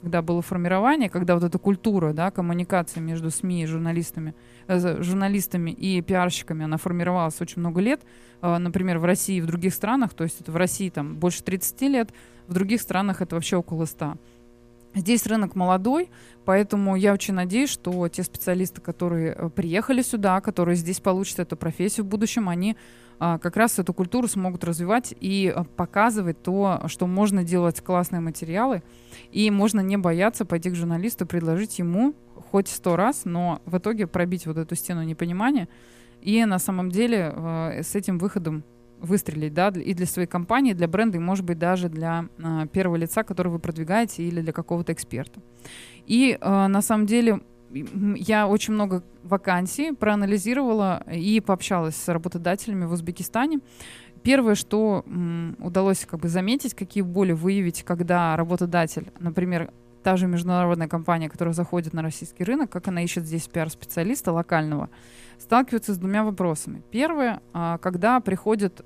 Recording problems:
electrical hum; faint; throughout; 60 Hz, 30 dB below the speech

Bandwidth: 14.5 kHz